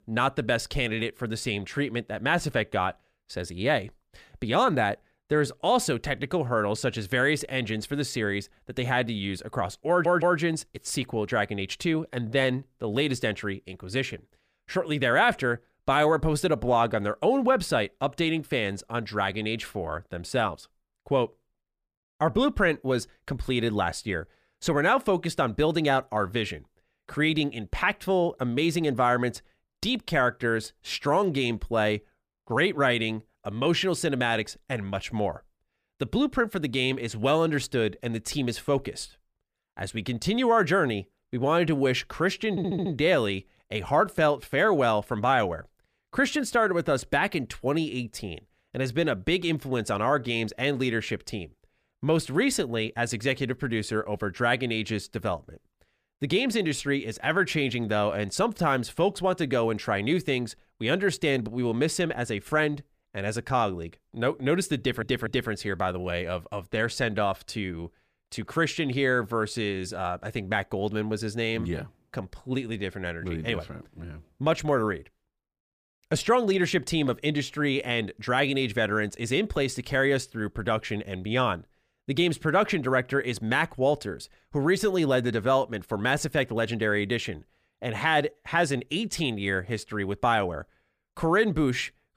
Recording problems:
audio stuttering; at 10 s, at 43 s and at 1:05

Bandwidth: 15 kHz